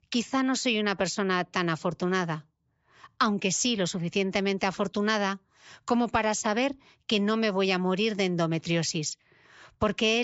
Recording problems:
high frequencies cut off; noticeable; nothing above 8 kHz
abrupt cut into speech; at the end

